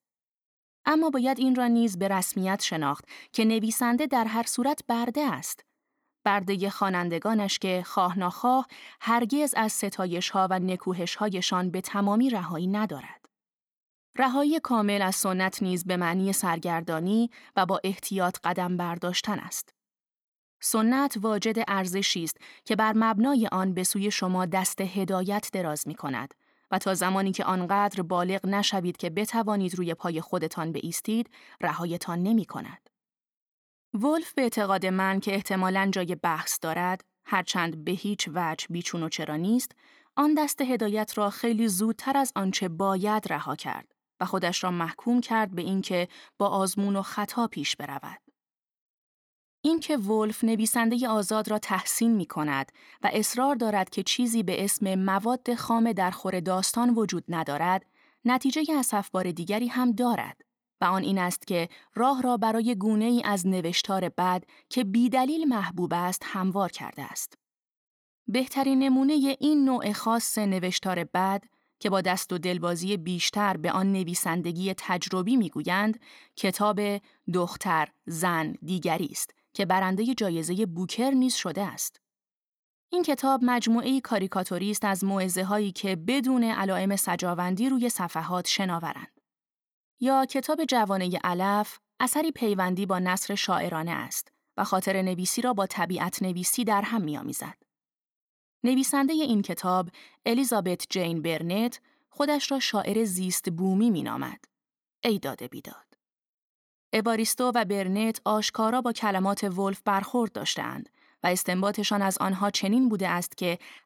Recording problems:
none

